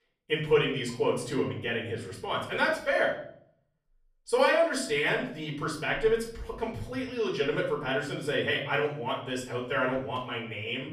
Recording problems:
off-mic speech; far
room echo; noticeable; dies away in 0.6 s

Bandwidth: 14.5 kHz